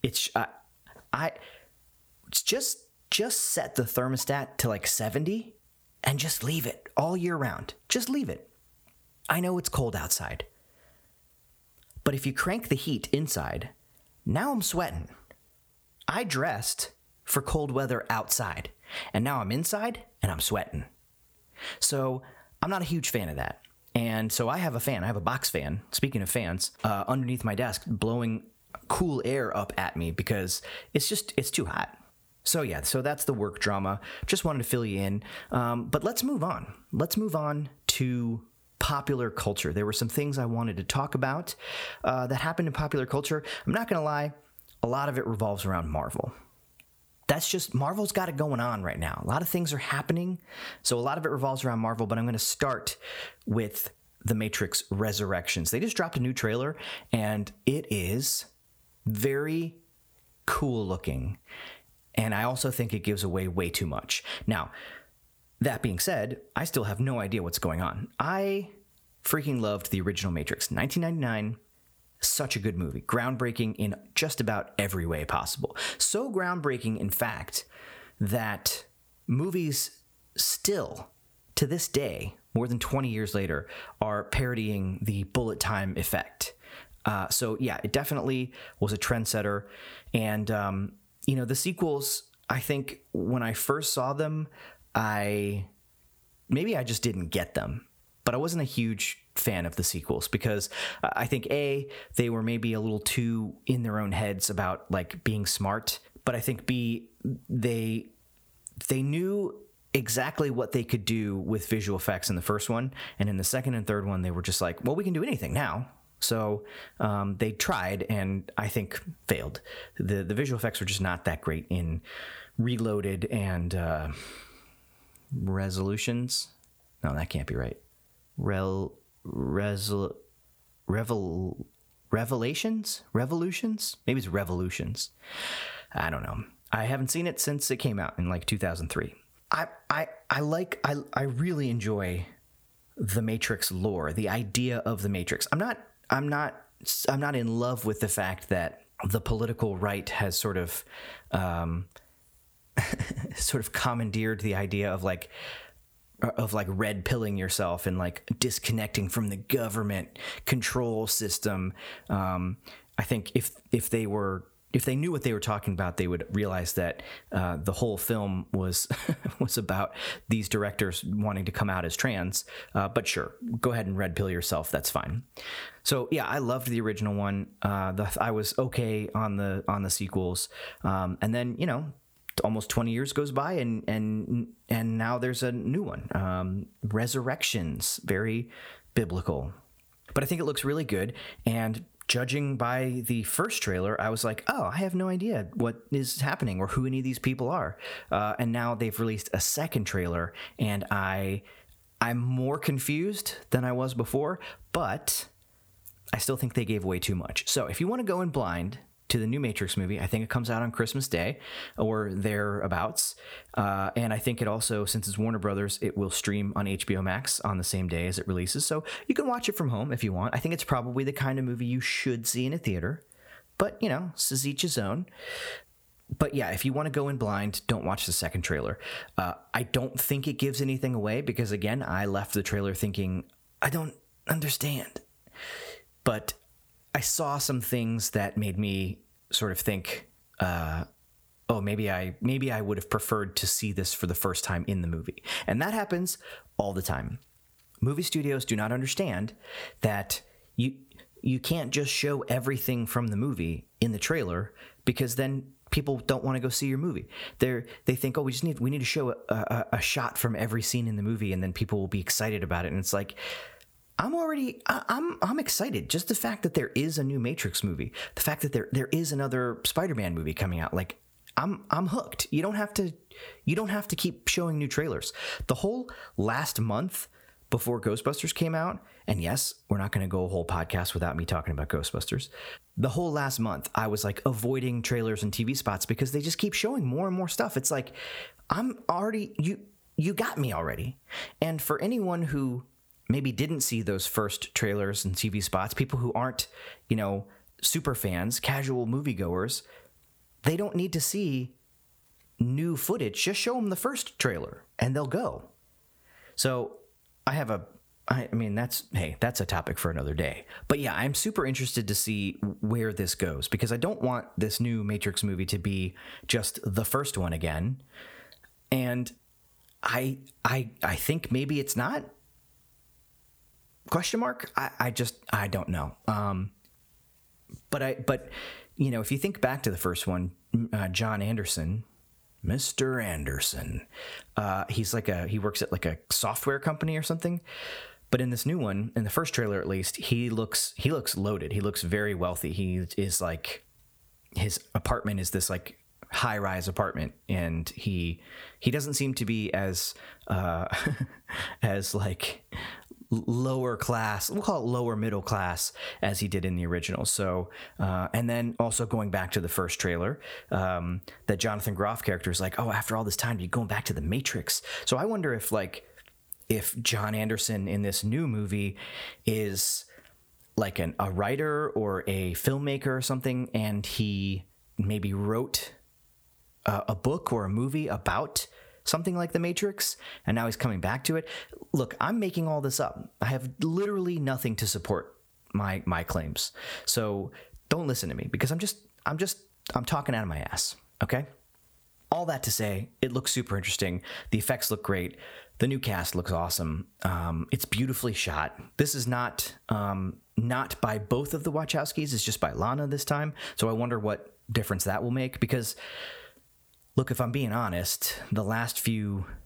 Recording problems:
squashed, flat; somewhat

